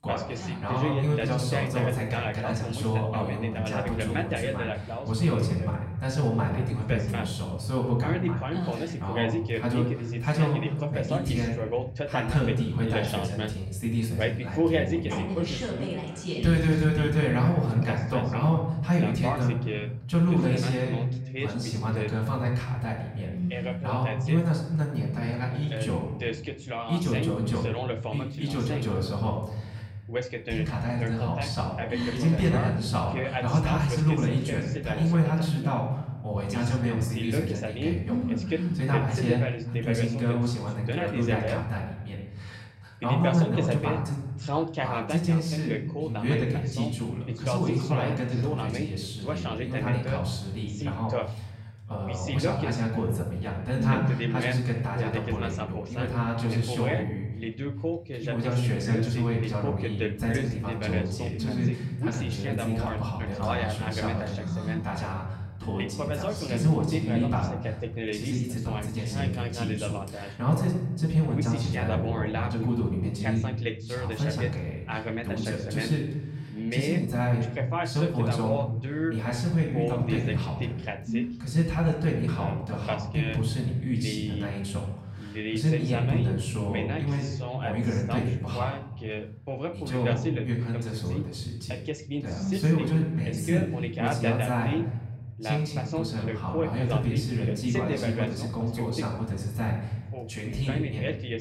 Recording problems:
off-mic speech; far
room echo; noticeable; dies away in 1.1 s
voice in the background; loud; throughout; 6 dB below the speech

